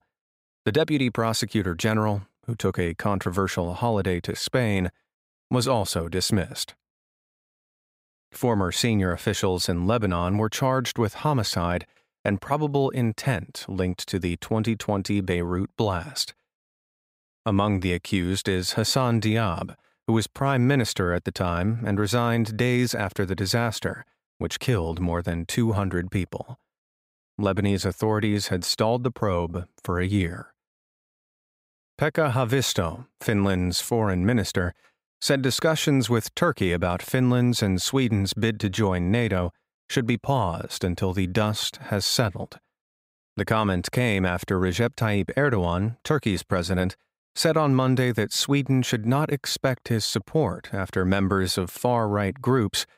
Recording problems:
none

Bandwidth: 15.5 kHz